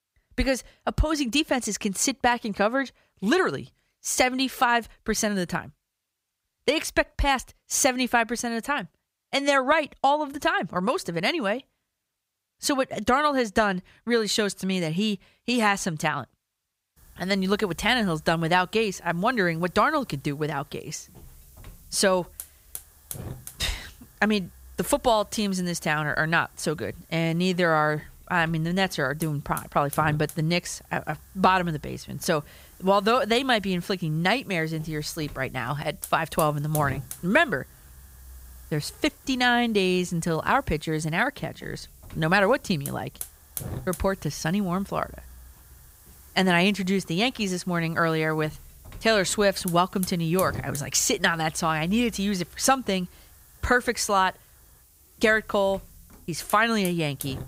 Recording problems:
hiss; noticeable; from 17 s on; 20 dB below the speech

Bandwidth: 15.5 kHz